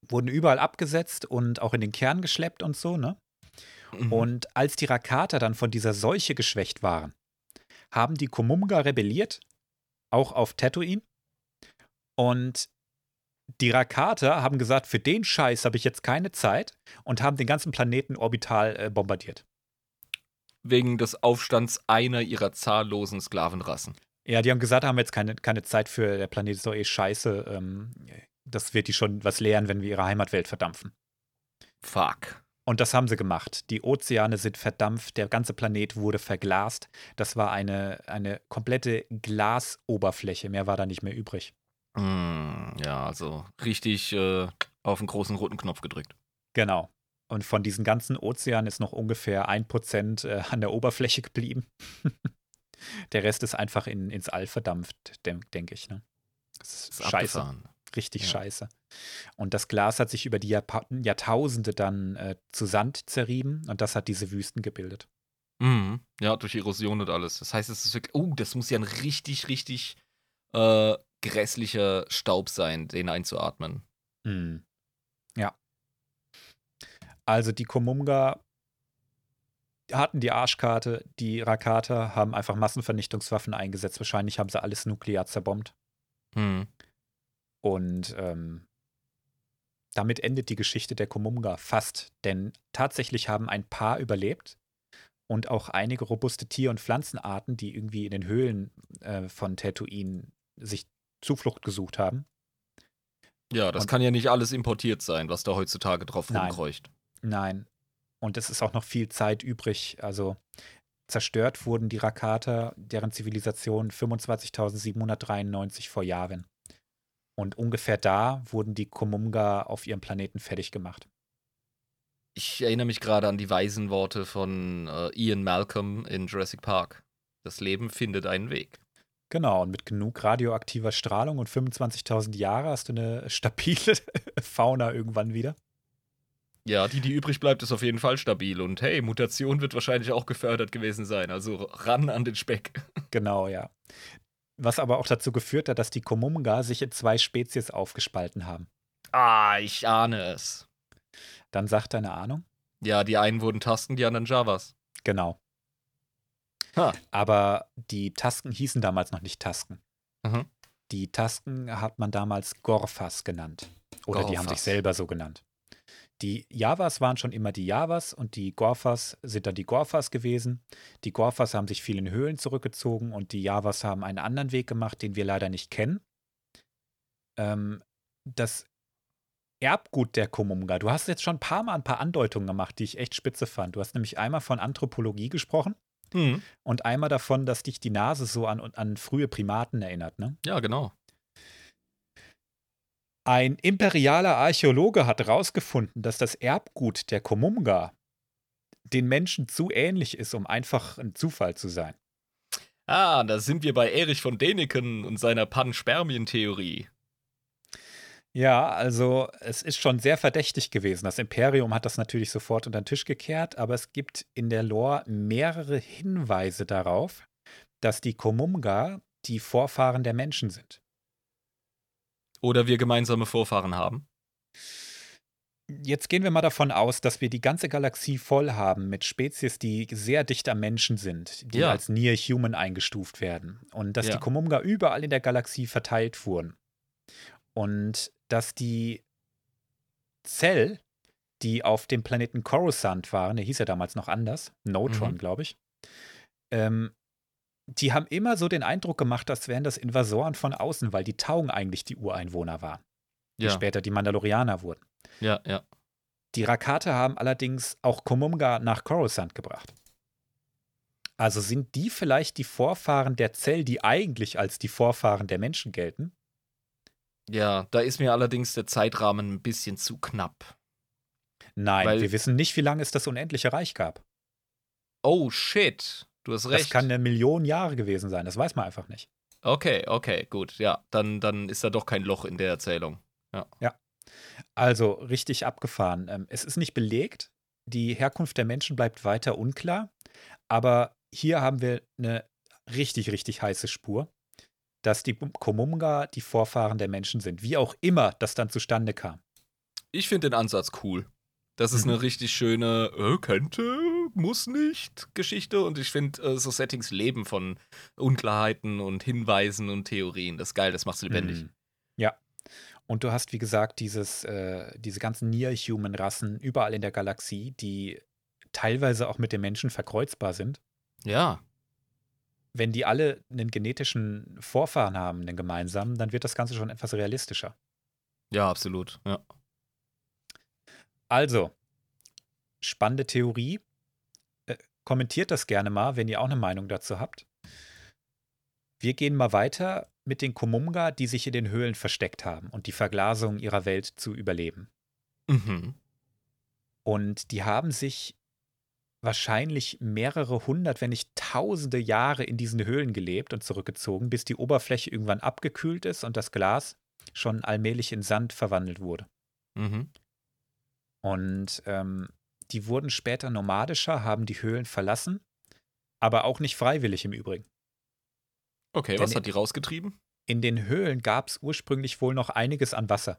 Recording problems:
none

